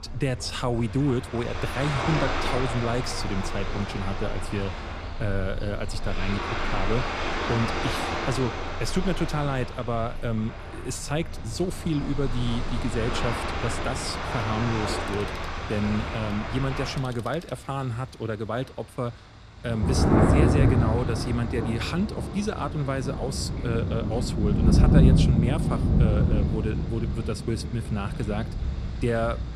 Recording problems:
rain or running water; very loud; throughout; 2 dB above the speech
alarms or sirens; faint; until 18 s; 25 dB below the speech

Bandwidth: 14.5 kHz